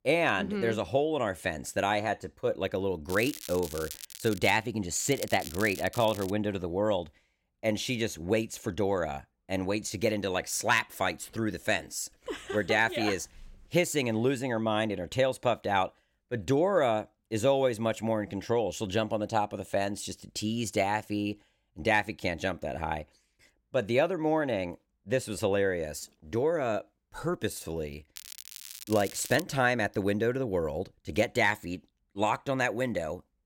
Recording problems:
crackling; noticeable; from 3 to 4.5 s, from 5 to 6.5 s and from 28 to 29 s; 10 dB below the speech

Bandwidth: 16.5 kHz